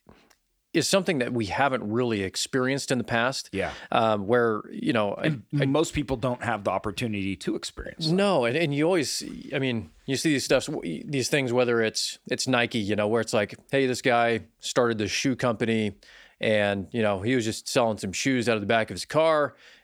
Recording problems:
none

